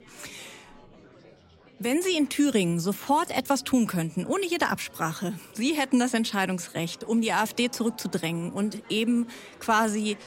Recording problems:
murmuring crowd; faint; throughout; 25 dB below the speech

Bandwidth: 16 kHz